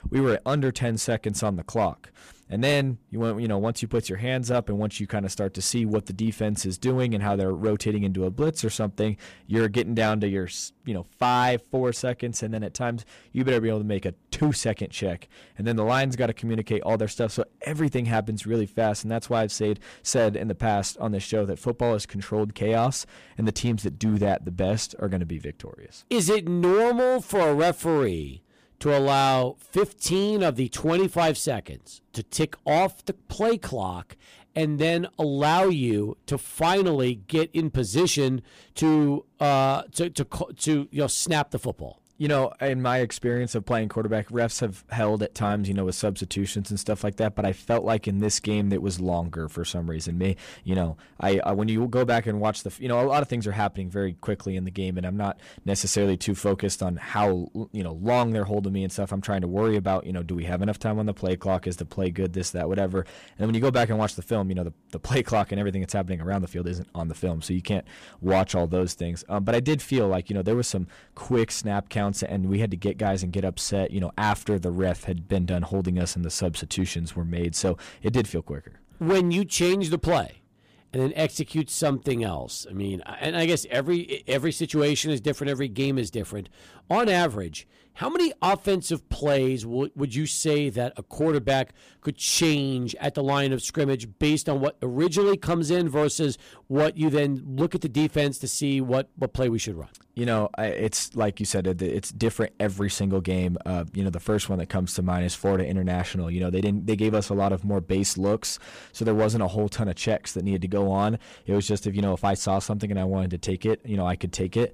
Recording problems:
distortion; slight; 5% of the sound clipped

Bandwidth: 15 kHz